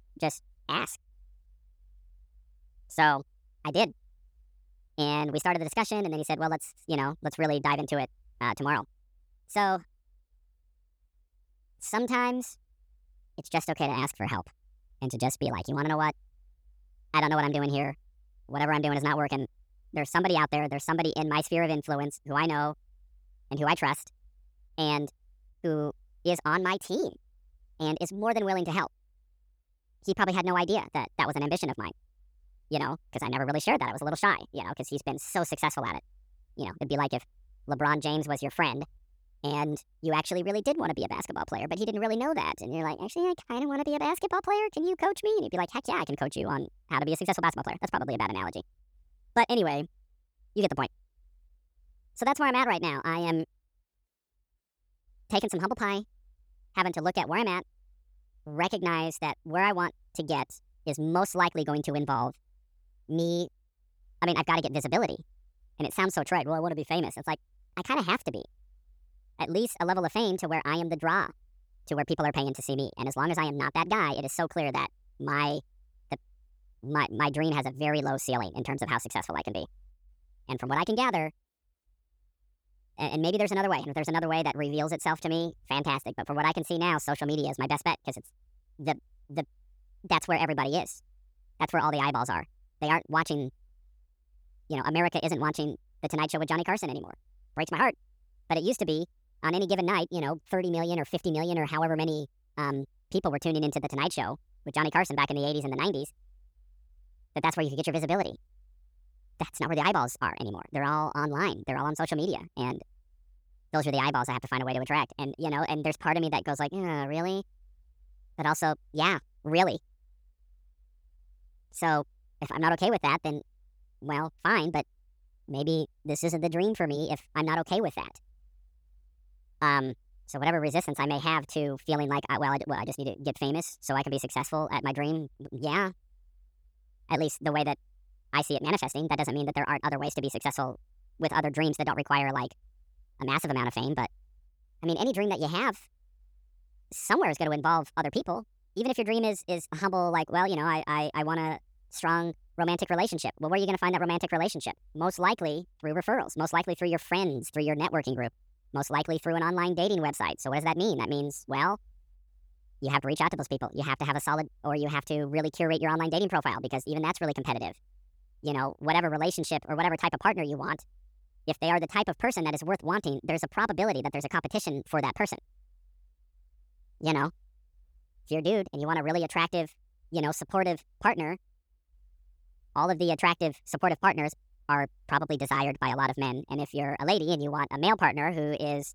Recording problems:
wrong speed and pitch; too fast and too high; 1.5 times normal speed

